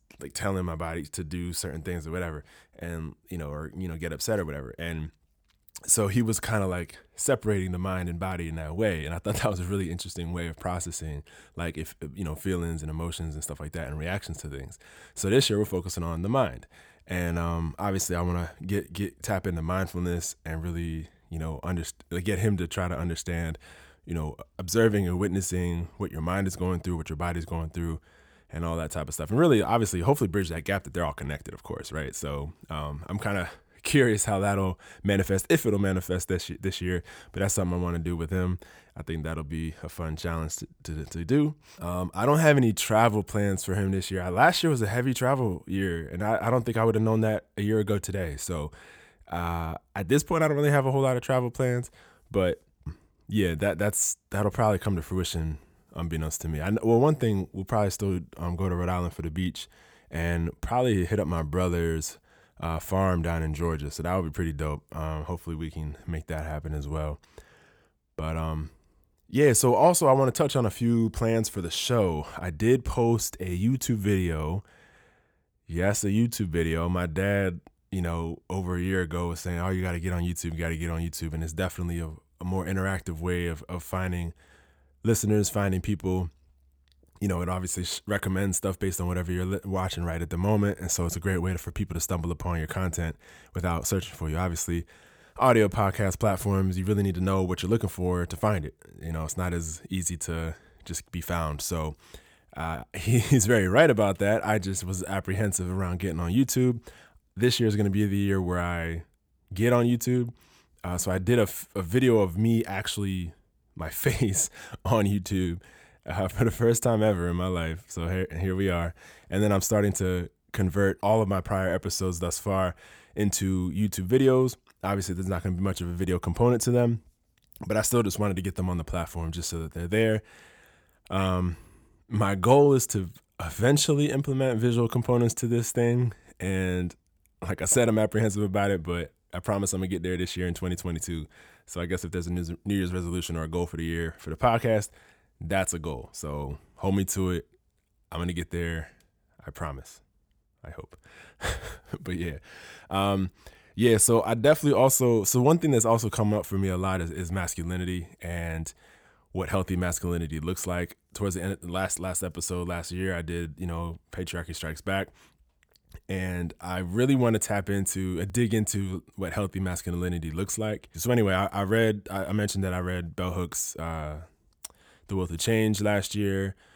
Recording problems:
none

